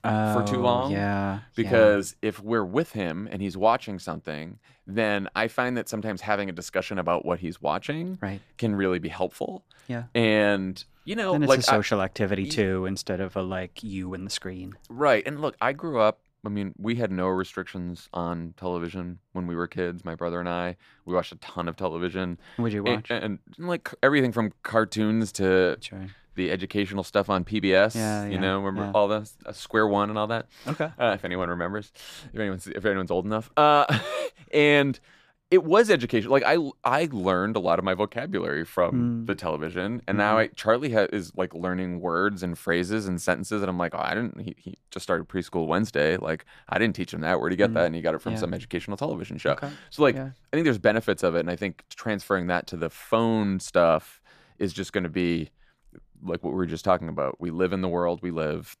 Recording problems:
none

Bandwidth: 14.5 kHz